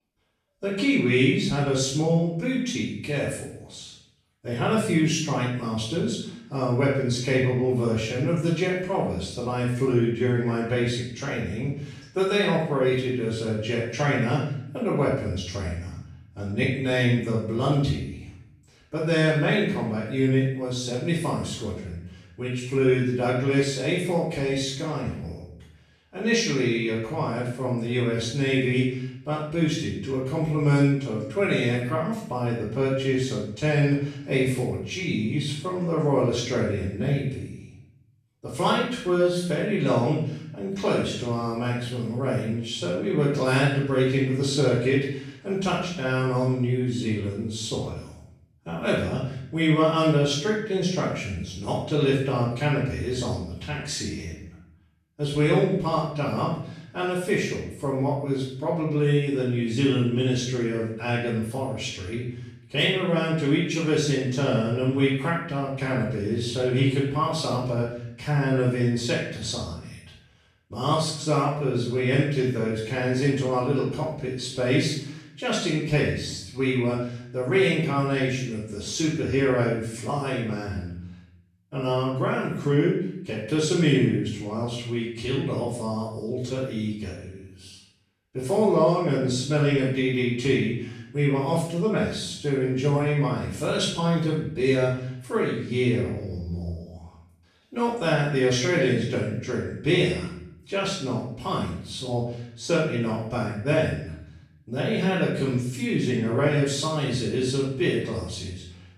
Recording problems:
off-mic speech; far
room echo; noticeable; dies away in 0.7 s

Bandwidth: 14 kHz